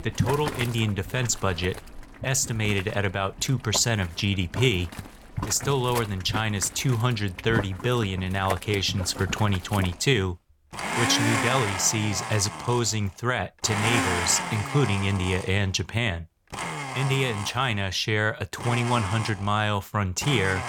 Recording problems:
household noises; loud; throughout; 7 dB below the speech

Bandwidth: 17.5 kHz